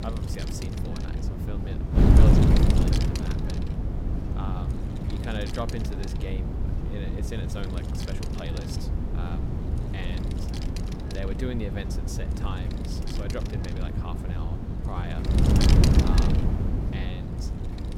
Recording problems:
wind noise on the microphone; heavy; 4 dB above the speech
low rumble; noticeable; throughout; 15 dB below the speech
rain or running water; very faint; throughout; 15 dB below the speech

